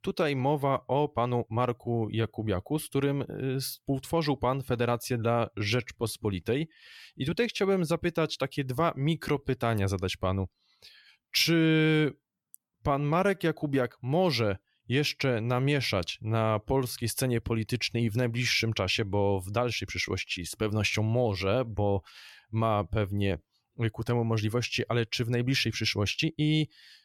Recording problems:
uneven, jittery; strongly; from 1 to 26 s

